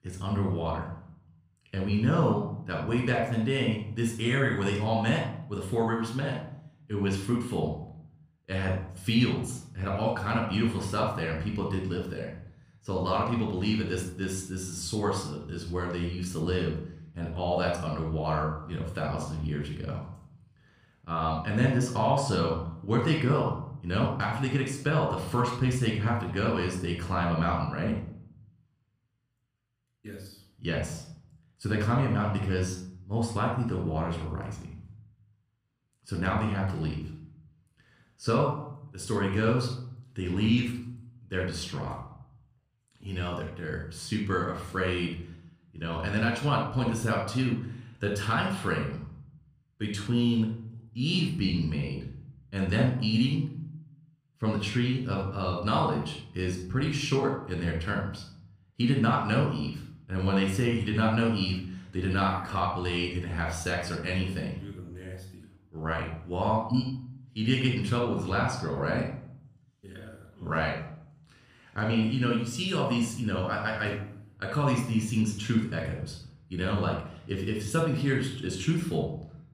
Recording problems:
room echo; noticeable; dies away in 0.6 s
off-mic speech; somewhat distant

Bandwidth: 14.5 kHz